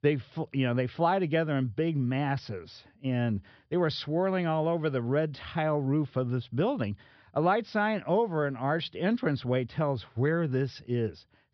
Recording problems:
high frequencies cut off; noticeable; nothing above 5.5 kHz

